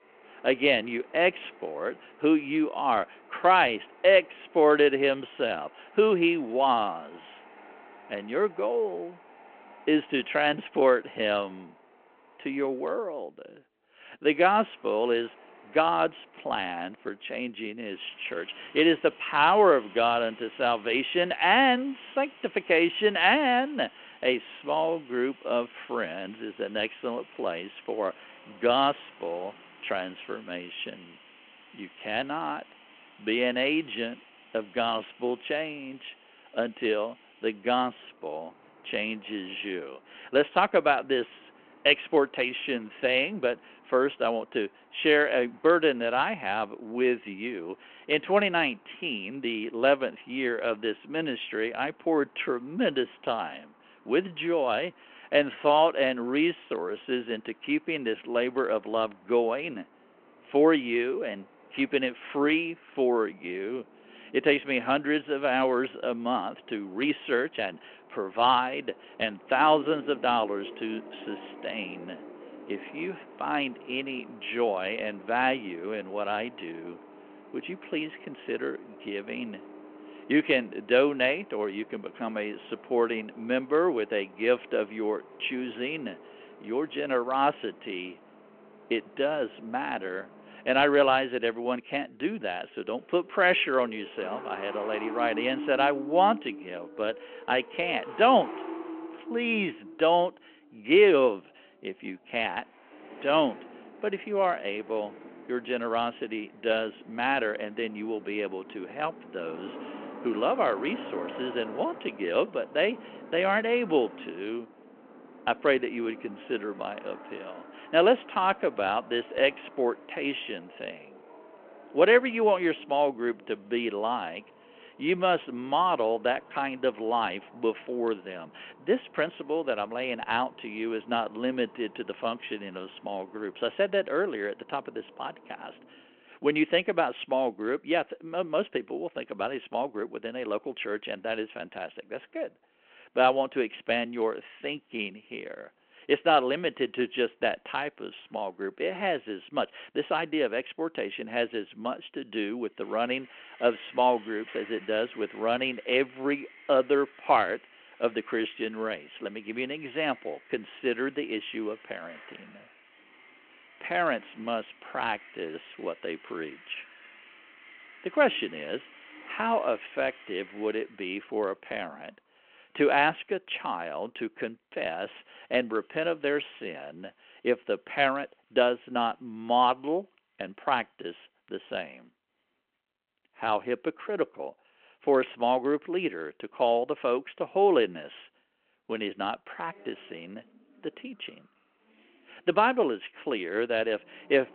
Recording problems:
phone-call audio
traffic noise; faint; throughout; 20 dB below the speech

